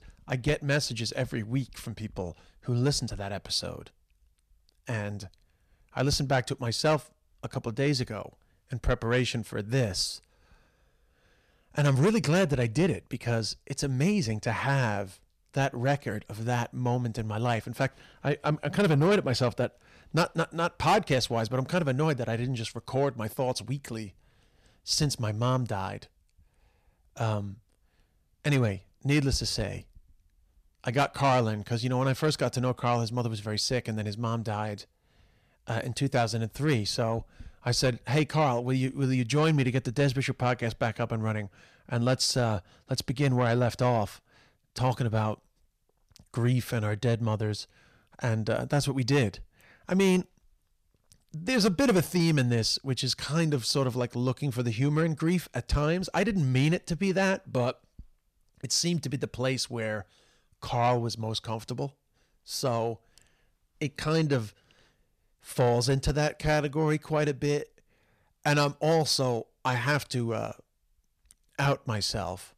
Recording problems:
distortion; slight; 10 dB below the speech

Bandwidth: 14.5 kHz